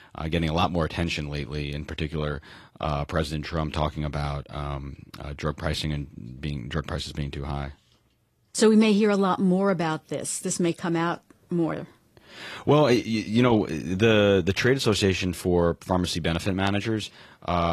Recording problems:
garbled, watery; slightly
abrupt cut into speech; at the end

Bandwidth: 14.5 kHz